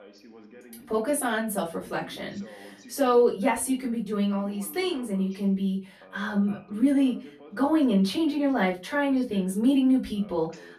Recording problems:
off-mic speech; far
room echo; very slight; dies away in 0.2 s
voice in the background; faint; throughout; 25 dB below the speech

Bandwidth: 13.5 kHz